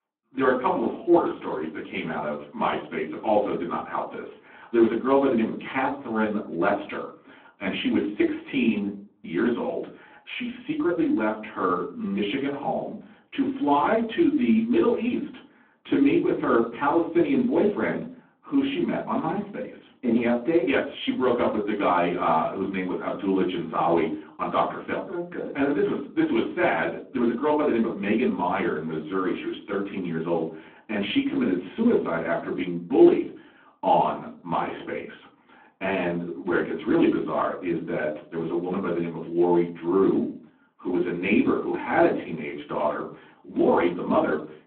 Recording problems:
off-mic speech; far
phone-call audio
room echo; very slight; dies away in 0.4 s

